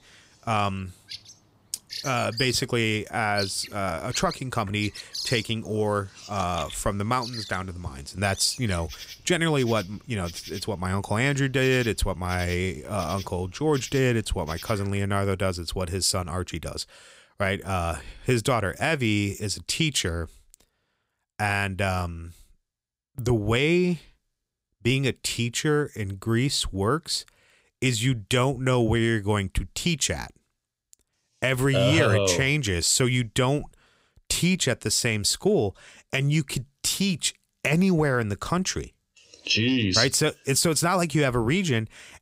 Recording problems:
animal sounds; noticeable; until 15 s; 15 dB below the speech

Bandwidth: 15.5 kHz